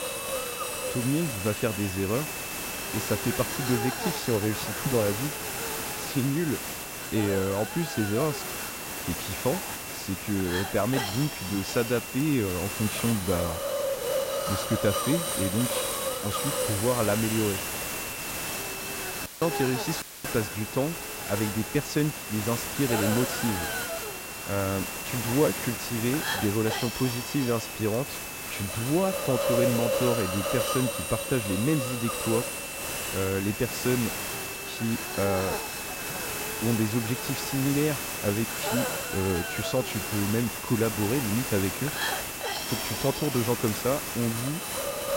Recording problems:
hiss; loud; throughout; 2 dB below the speech
high-pitched whine; noticeable; until 13 s and from 17 s on; 2.5 kHz, 10 dB below the speech
audio cutting out; filled with static; at 19 s and at 20 s

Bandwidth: 16 kHz